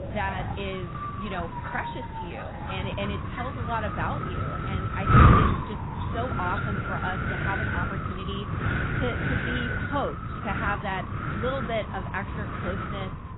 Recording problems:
garbled, watery; badly; nothing above 4 kHz
wind noise on the microphone; heavy; 4 dB above the speech
animal sounds; noticeable; throughout; 10 dB below the speech

